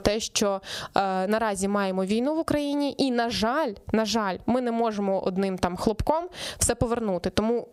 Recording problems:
squashed, flat; somewhat

